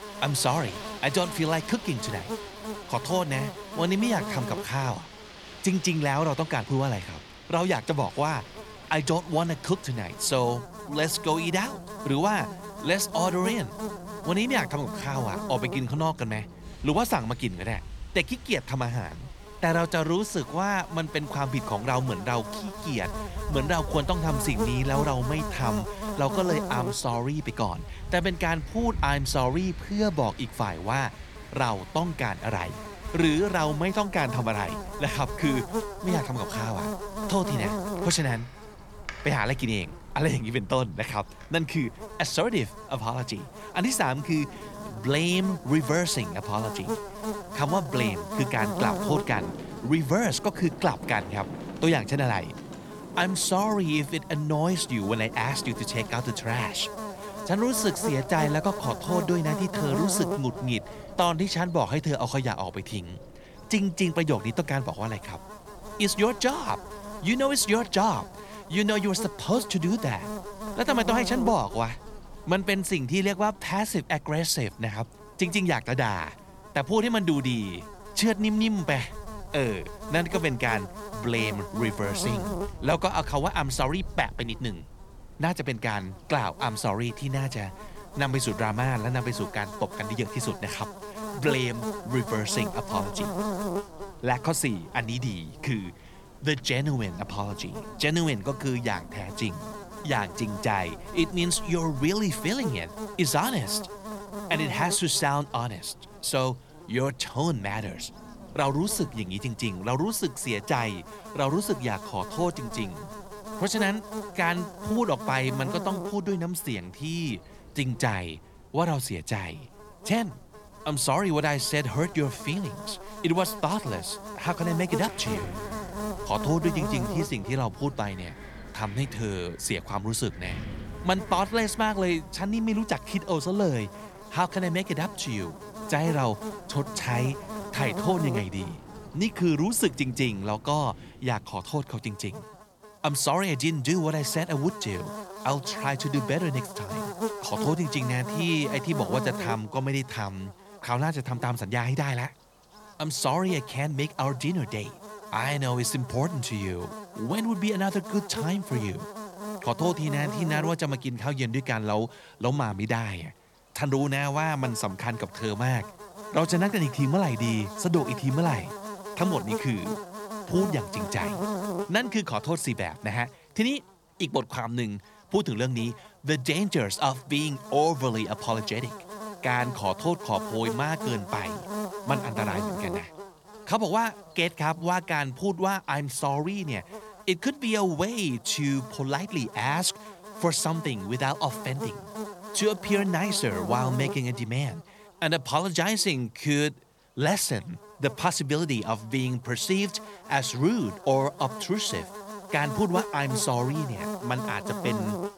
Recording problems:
electrical hum; loud; throughout; 50 Hz, 9 dB below the speech
wind in the background; noticeable; until 2:21; 15 dB below the speech

